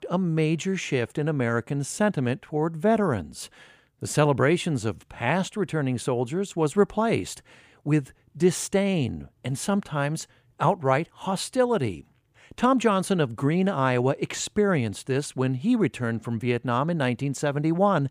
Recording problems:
none

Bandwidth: 15 kHz